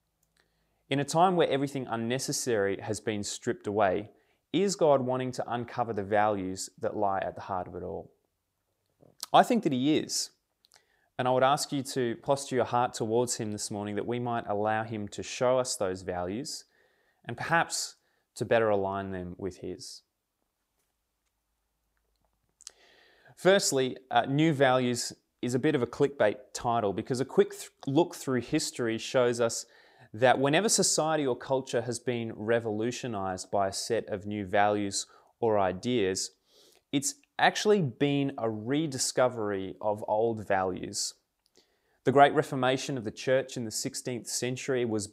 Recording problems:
none

